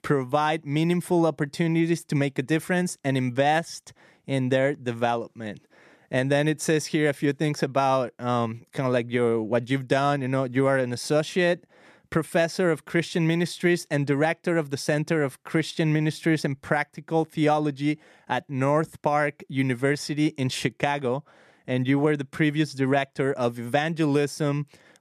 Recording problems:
none

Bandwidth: 14 kHz